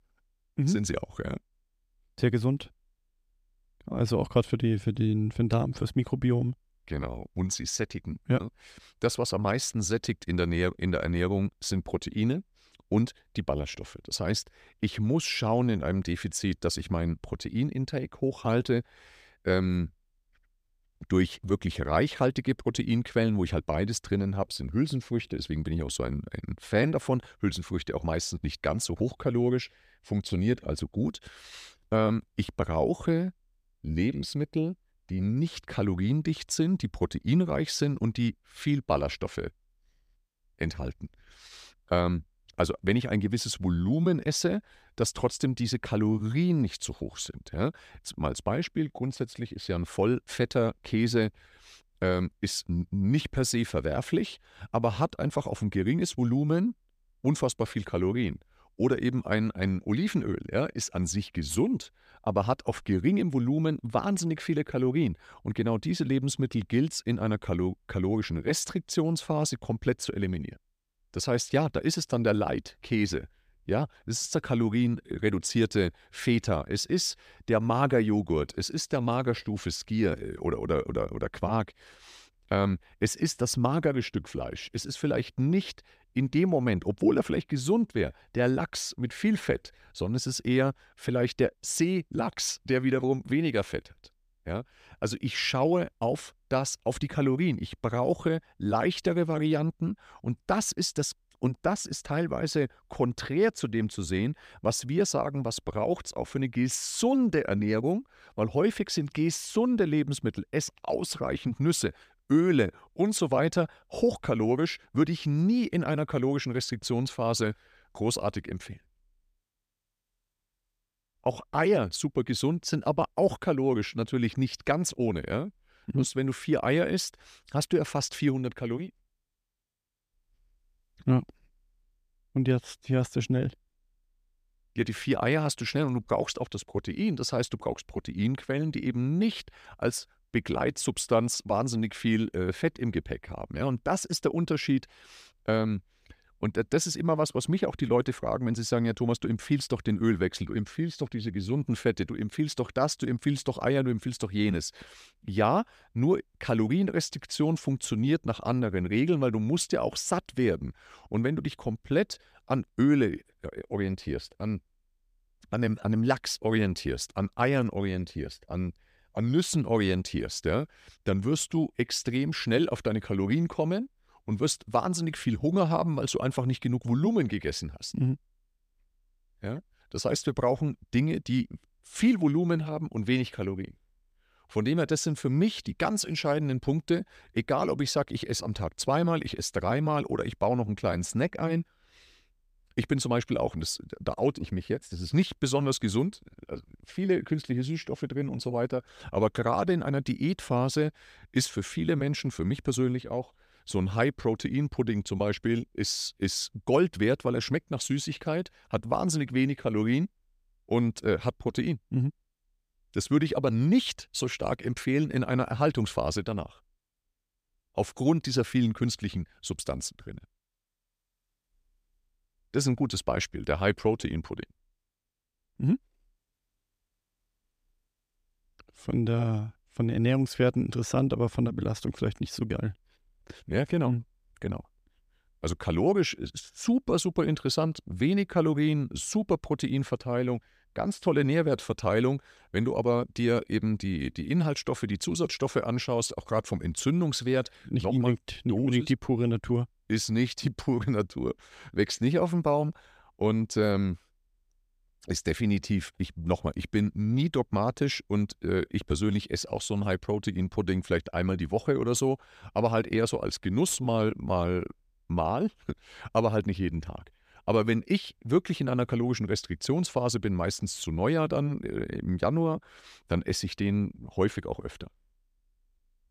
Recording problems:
none

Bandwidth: 14.5 kHz